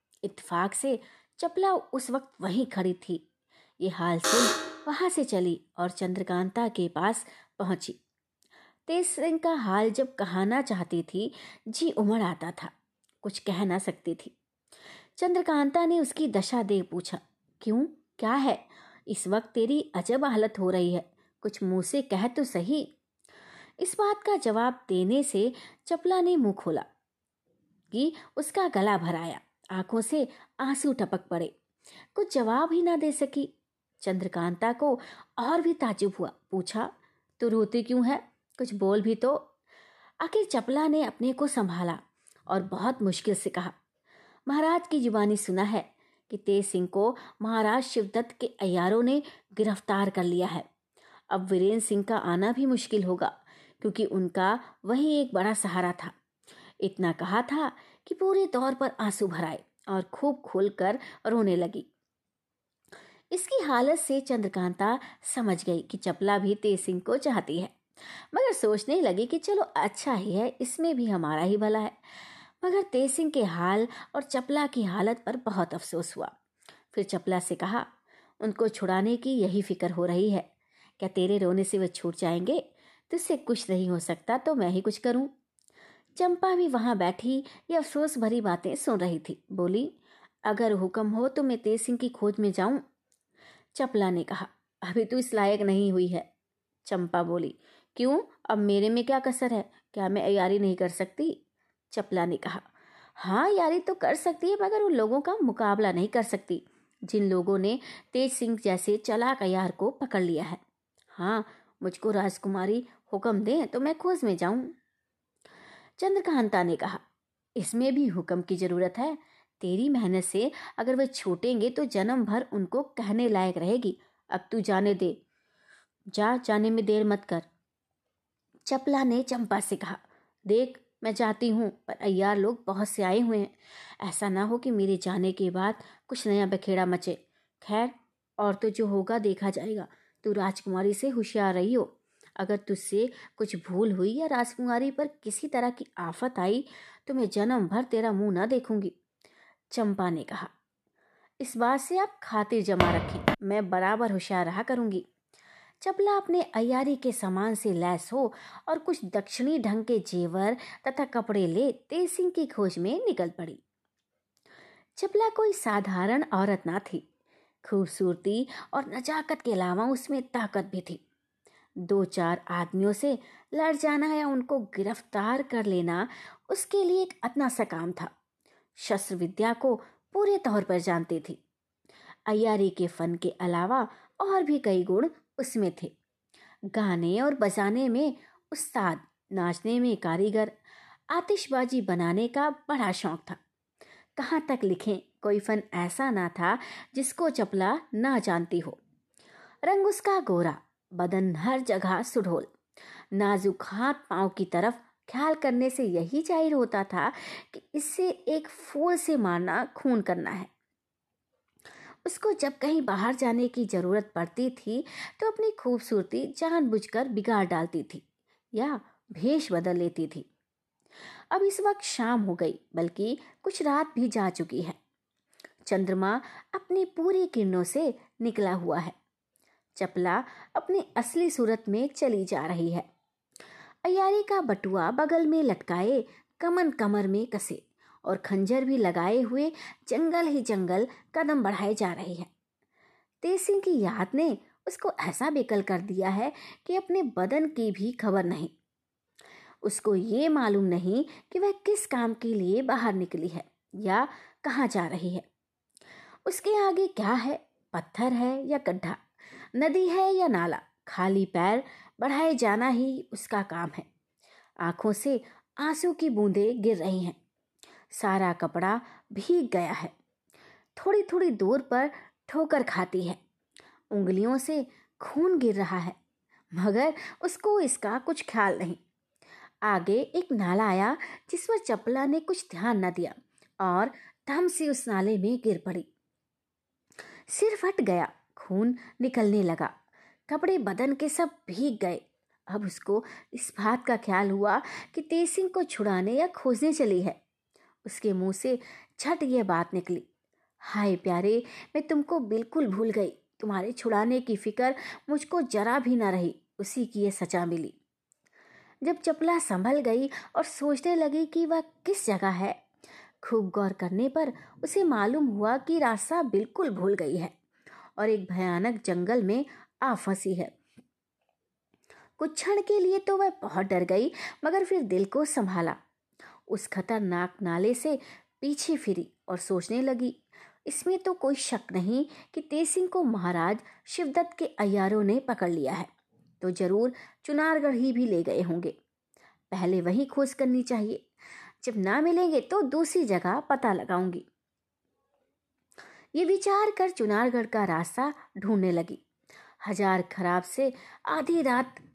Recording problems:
alarm; loud; at 4 s; peak 5 dB above the speech
uneven, jittery; strongly; from 1:23 to 5:18
footsteps; loud; at 2:33; peak 2 dB above the speech

